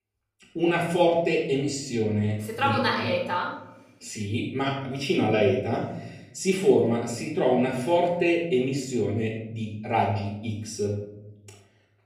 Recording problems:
off-mic speech; far
room echo; noticeable; dies away in 0.9 s

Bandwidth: 15 kHz